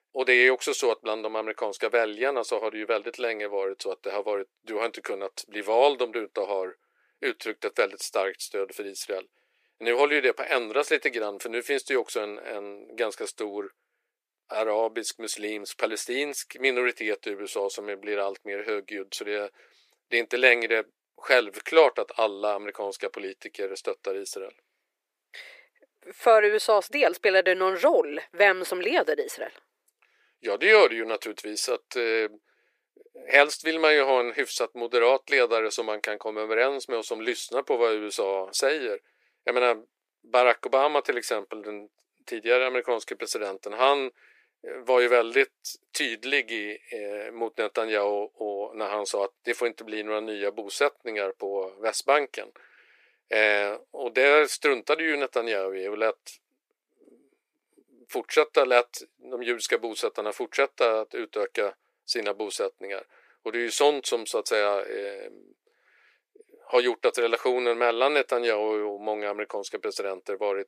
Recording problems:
thin; very; fading below 350 Hz

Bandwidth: 15 kHz